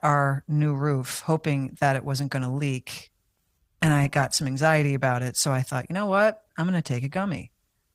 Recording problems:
garbled, watery; slightly; nothing above 15.5 kHz

